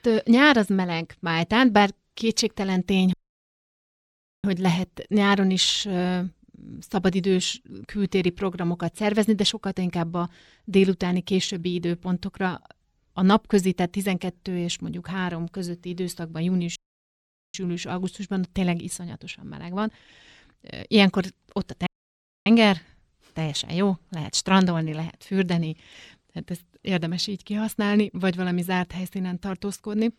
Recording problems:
audio cutting out; at 3 s for 1.5 s, at 17 s for 1 s and at 22 s for 0.5 s

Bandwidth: 17.5 kHz